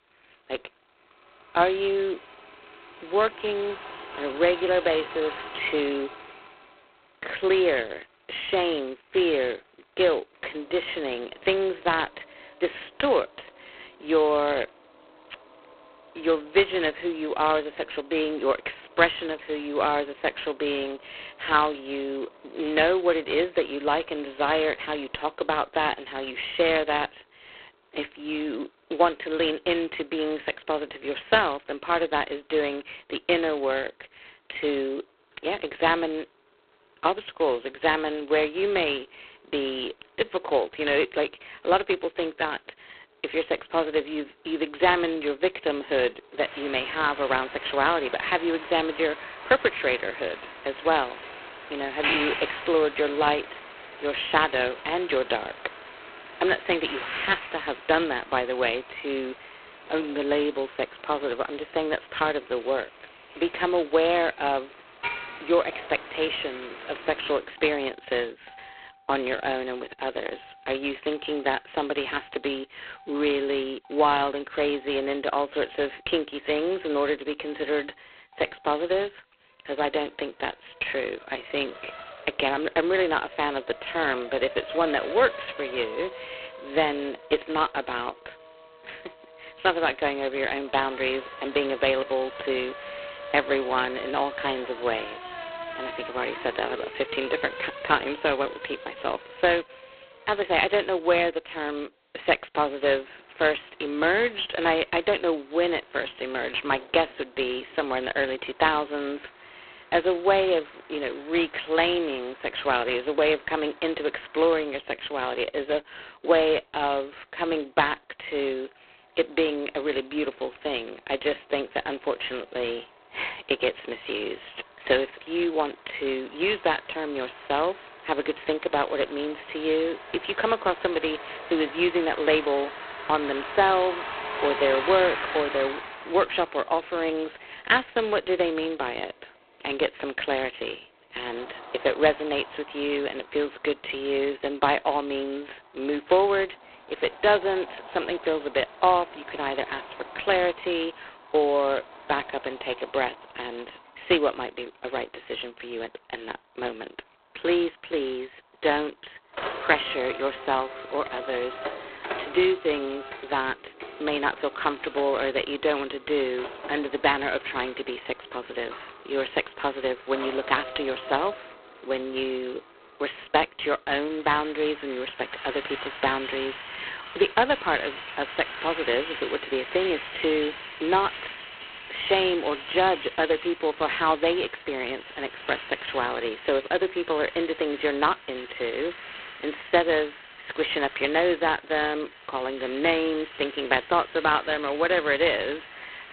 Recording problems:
phone-call audio; poor line; nothing above 4 kHz
traffic noise; noticeable; throughout; 15 dB below the speech

